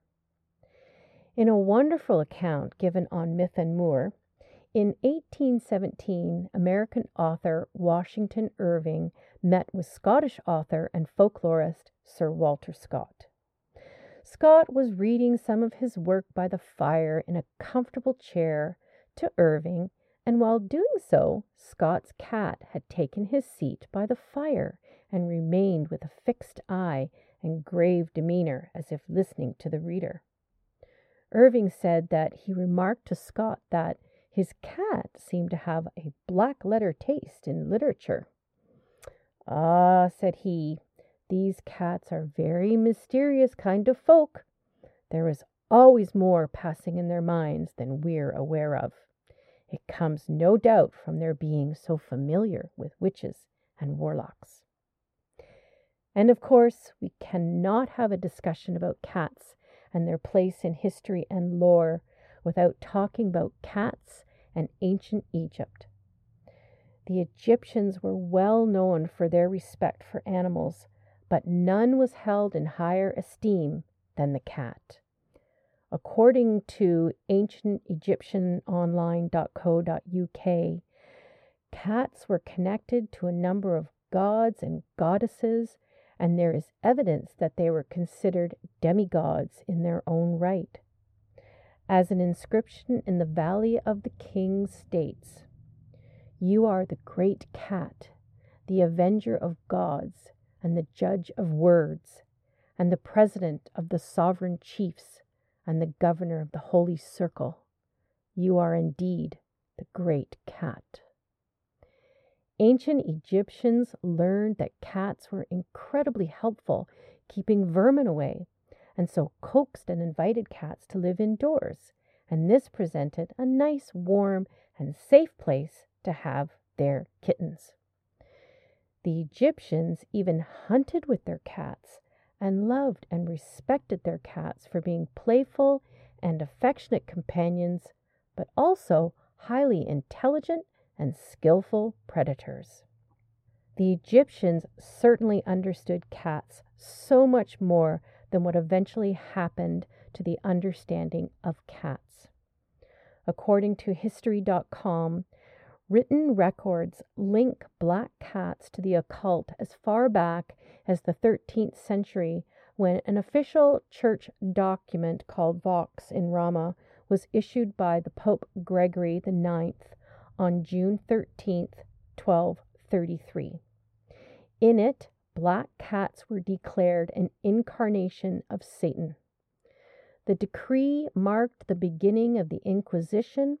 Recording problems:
muffled; very; fading above 2 kHz

